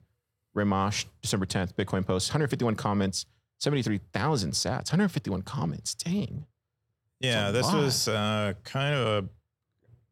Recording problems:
none

